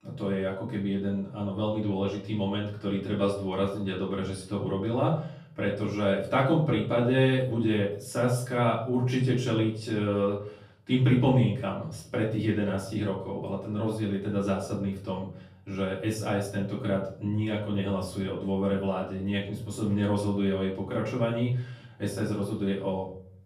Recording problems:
off-mic speech; far
room echo; slight; dies away in 0.5 s

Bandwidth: 15 kHz